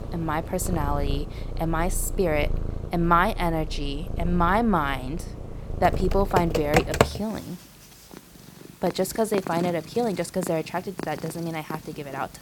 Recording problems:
animal sounds; loud; throughout; 9 dB below the speech
keyboard typing; loud; from 6 to 7 s; peak 5 dB above the speech

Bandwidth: 18 kHz